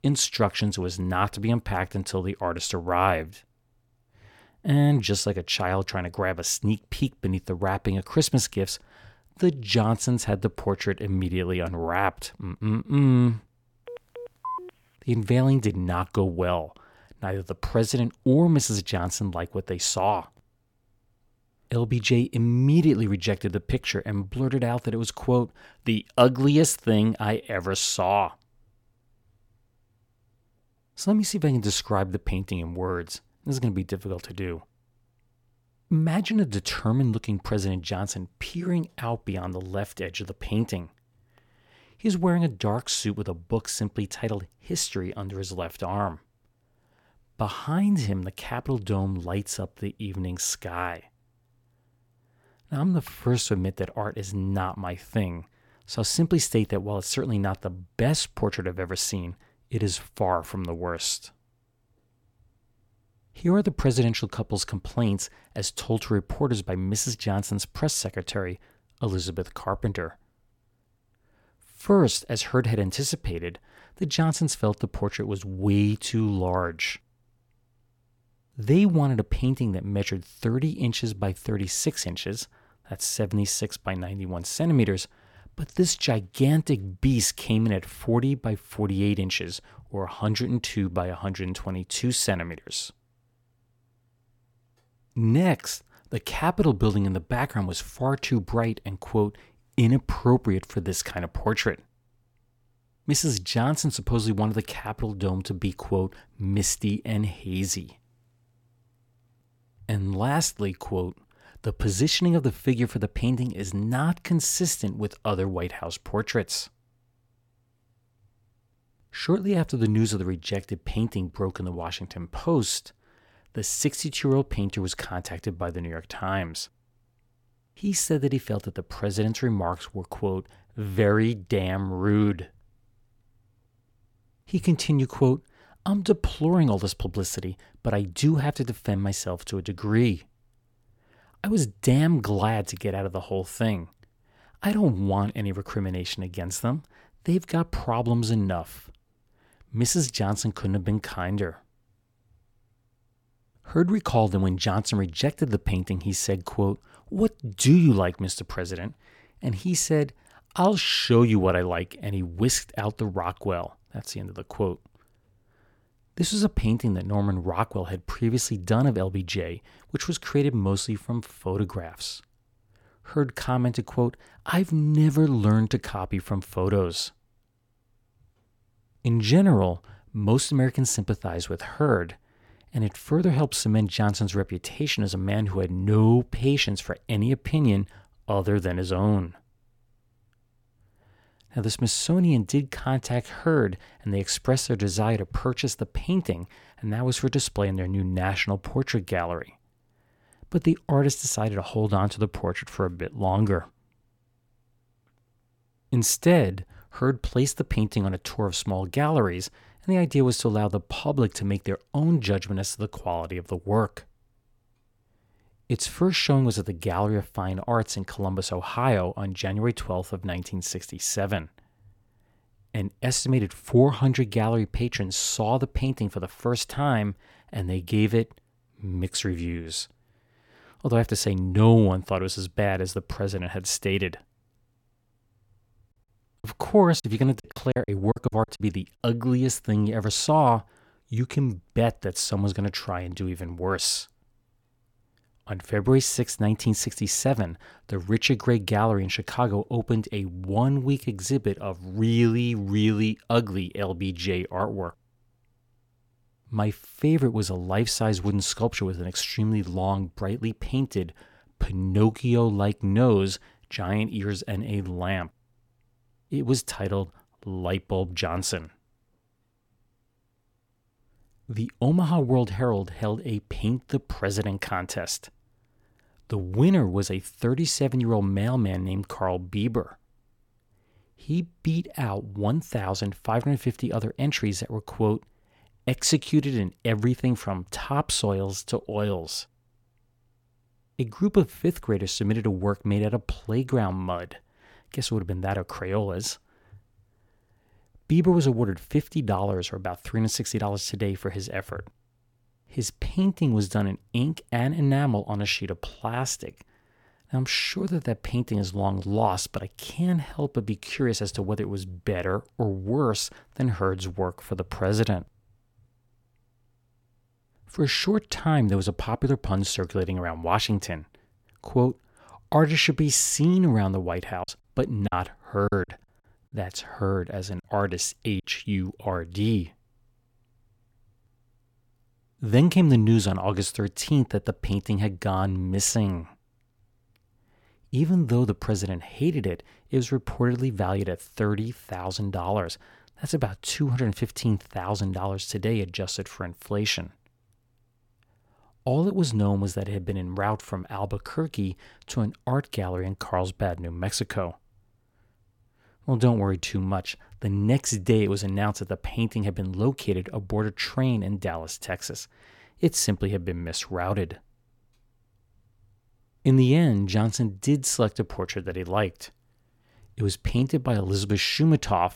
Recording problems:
phone ringing; noticeable; at 14 s; peak 8 dB below the speech
choppy; very; from 3:56 to 3:59 and from 5:24 to 5:28; 9% of the speech affected

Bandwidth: 17 kHz